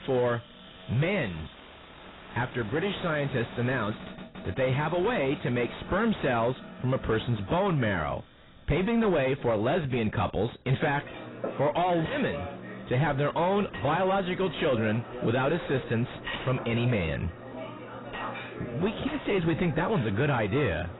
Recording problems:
distortion; heavy; 6 dB below the speech
garbled, watery; badly; nothing above 4 kHz
household noises; noticeable; throughout; 10 dB below the speech

